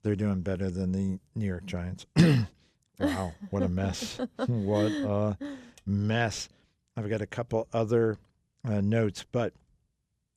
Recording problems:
none

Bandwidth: 14 kHz